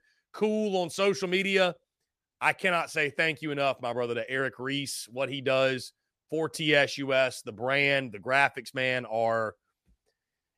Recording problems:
none

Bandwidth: 14.5 kHz